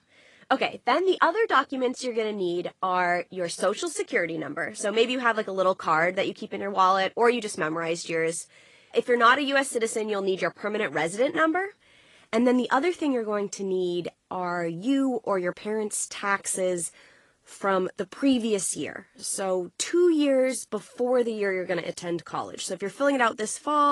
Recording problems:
garbled, watery; slightly; nothing above 10.5 kHz
abrupt cut into speech; at the end

